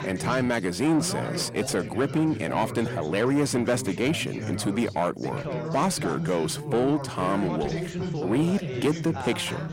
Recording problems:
distortion; slight; 10 dB below the speech
background chatter; loud; throughout; 3 voices, 7 dB below the speech

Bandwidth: 16 kHz